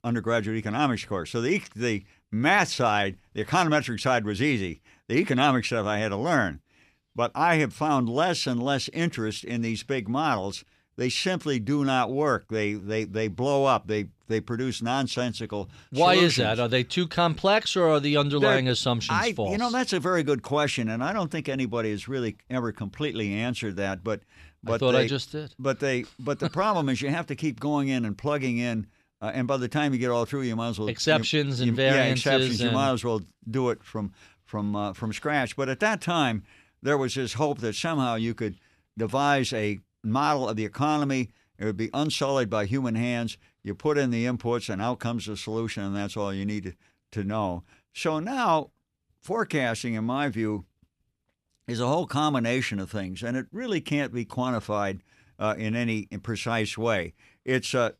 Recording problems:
none

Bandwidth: 14.5 kHz